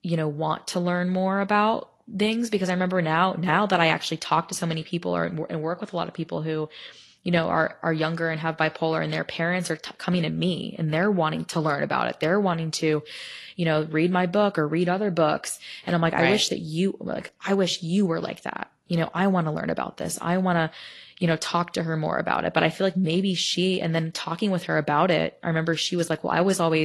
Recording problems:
garbled, watery; slightly; nothing above 11.5 kHz
abrupt cut into speech; at the end

